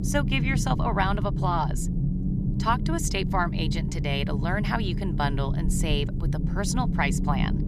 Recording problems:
low rumble; loud; throughout; 9 dB below the speech

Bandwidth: 14 kHz